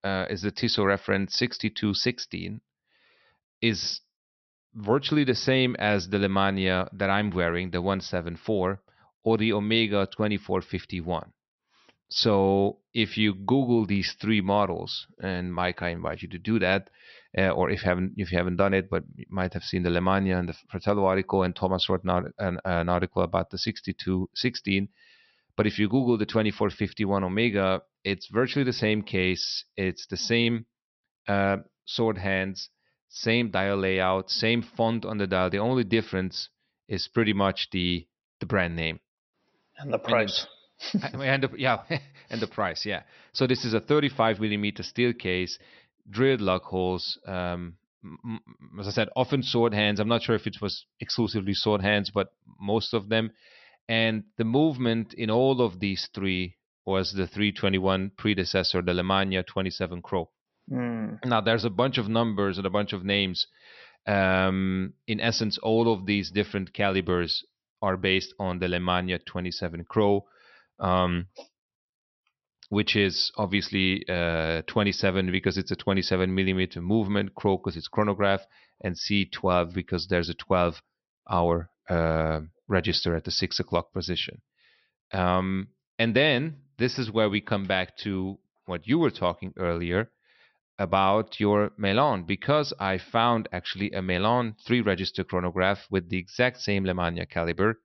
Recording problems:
high frequencies cut off; noticeable; nothing above 6 kHz

